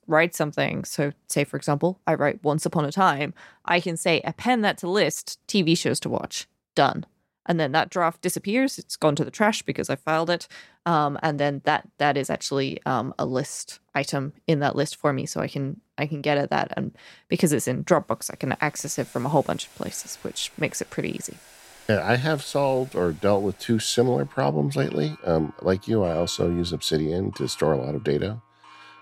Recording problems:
household noises; faint; from 18 s on; 25 dB below the speech

